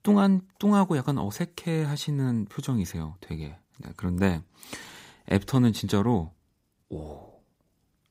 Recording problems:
none

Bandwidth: 15.5 kHz